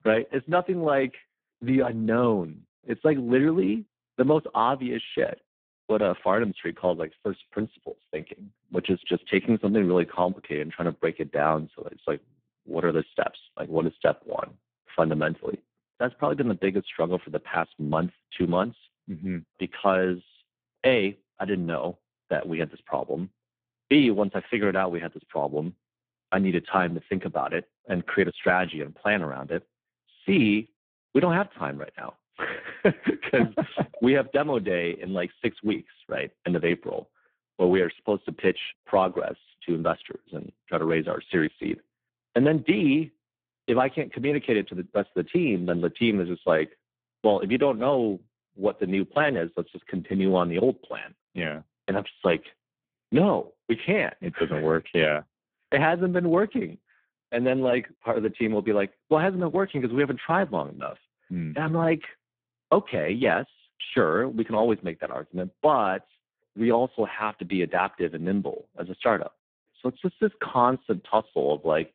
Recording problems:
phone-call audio; poor line

